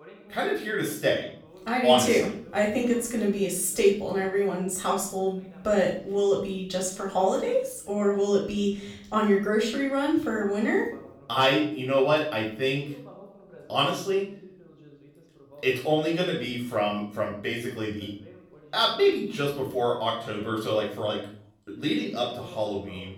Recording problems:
off-mic speech; far
room echo; noticeable; dies away in 0.5 s
voice in the background; faint; throughout; 25 dB below the speech

